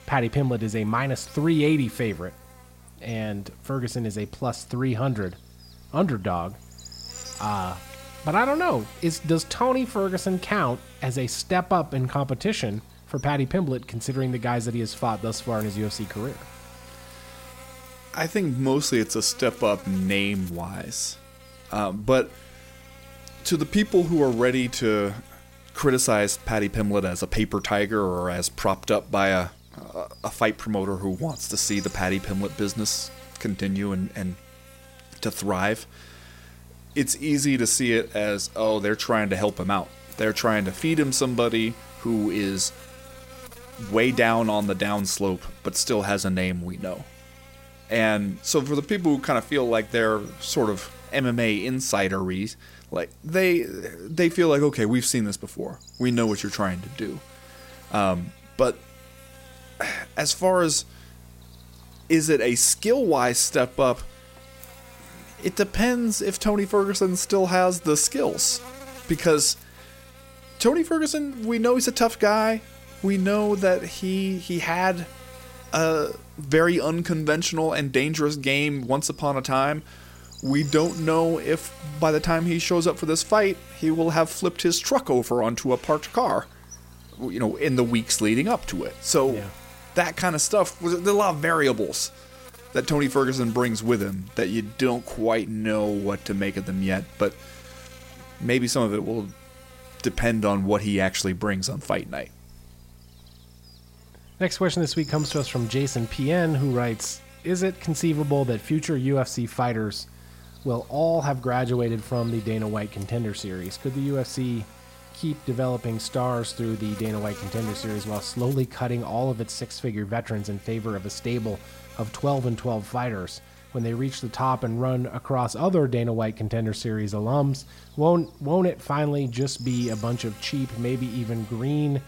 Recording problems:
electrical hum; faint; throughout; 60 Hz, 20 dB below the speech

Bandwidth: 16 kHz